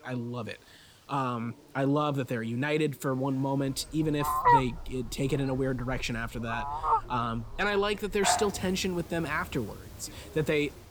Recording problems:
animal sounds; very loud; from 3.5 s on; 2 dB above the speech
voice in the background; faint; throughout; 25 dB below the speech
hiss; faint; throughout; 30 dB below the speech

